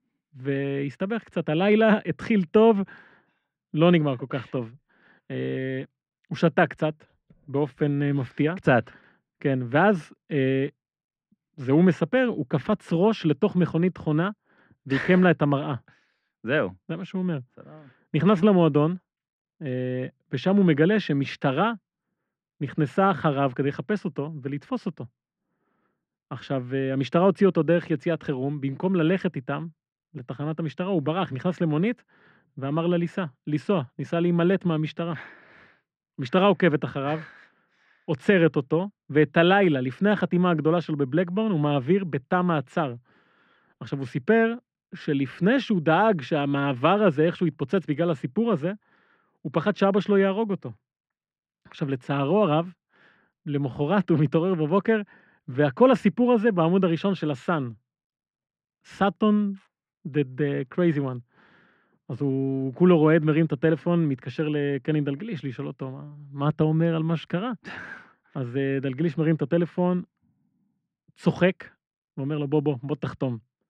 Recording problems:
muffled; very; fading above 2 kHz

